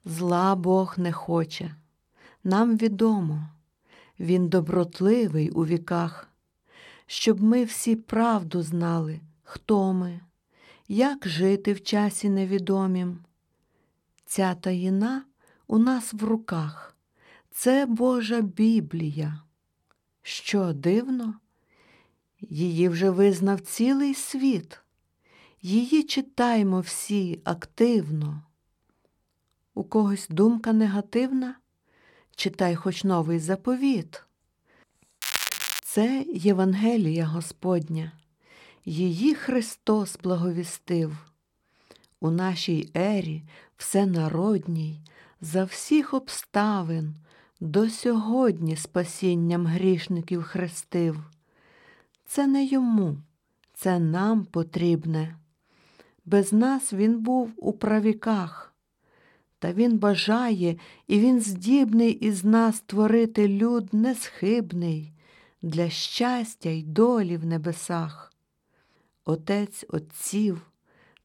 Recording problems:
crackling; loud; at 35 s, mostly in the pauses; 3 dB below the speech

